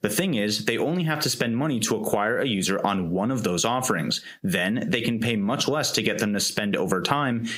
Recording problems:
squashed, flat; heavily

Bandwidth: 15.5 kHz